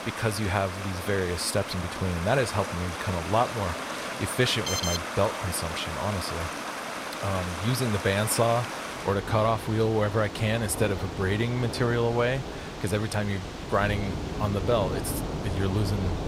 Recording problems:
rain or running water; loud; throughout; 6 dB below the speech
alarm; noticeable; at 4.5 s; peak 1 dB below the speech

